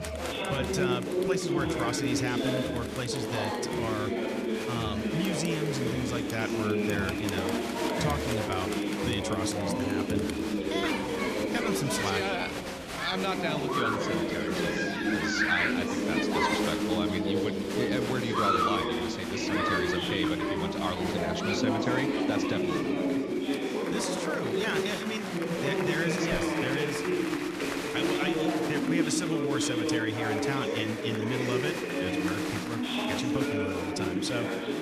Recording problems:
chatter from many people; very loud; throughout; 5 dB above the speech

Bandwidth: 14.5 kHz